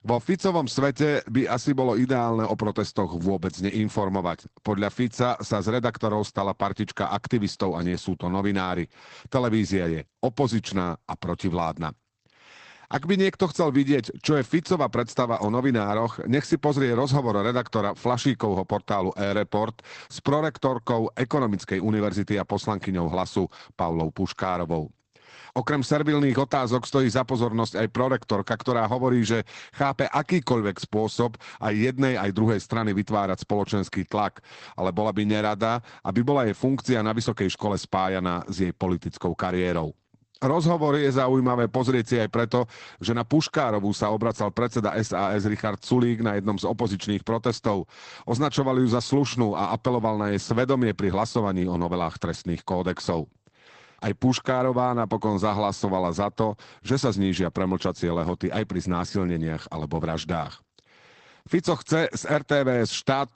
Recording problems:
garbled, watery; badly; nothing above 8 kHz

